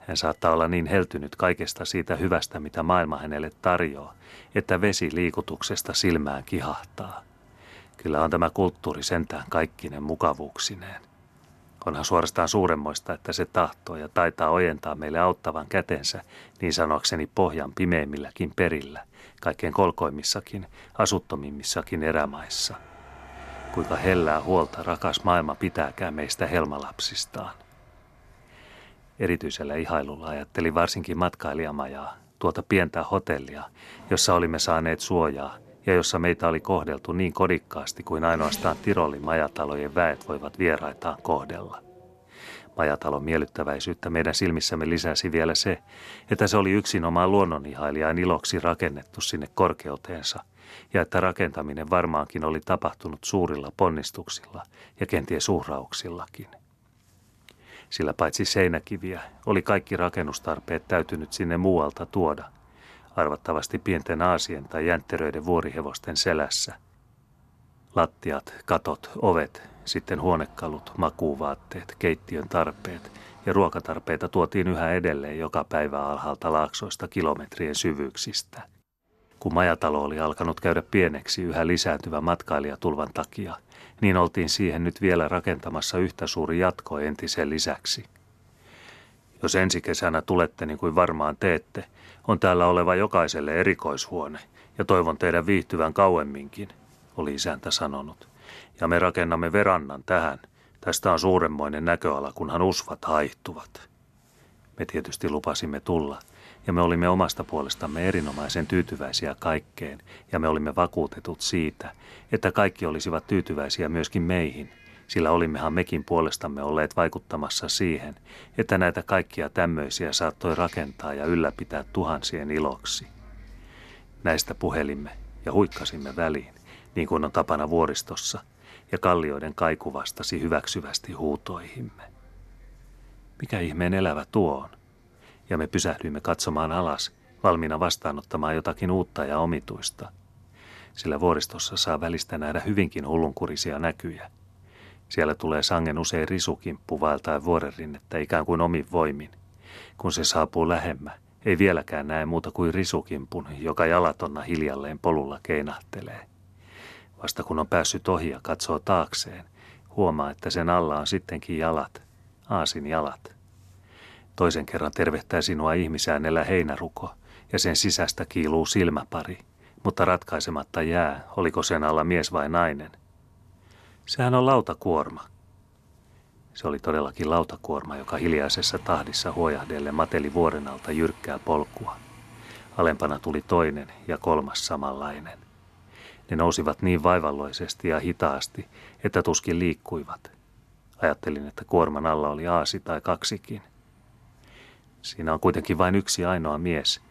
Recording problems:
traffic noise; faint; throughout; 25 dB below the speech

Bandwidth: 13.5 kHz